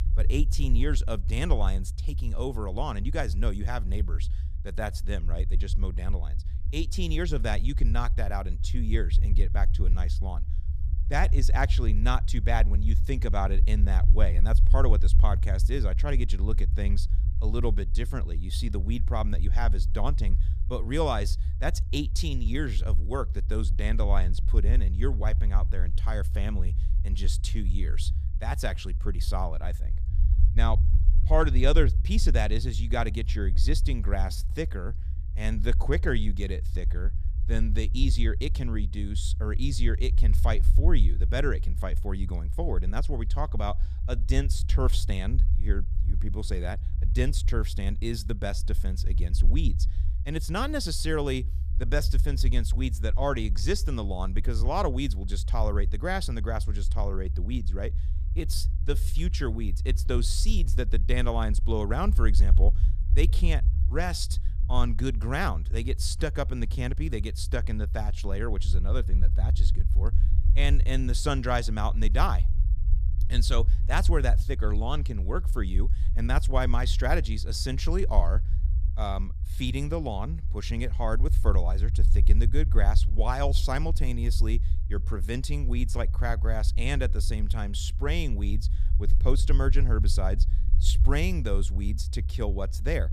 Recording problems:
low rumble; noticeable; throughout; 15 dB below the speech

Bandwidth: 14.5 kHz